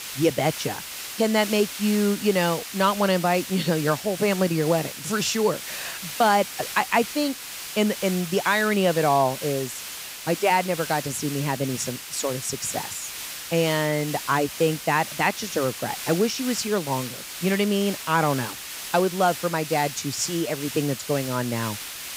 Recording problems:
hiss; loud; throughout; 9 dB below the speech

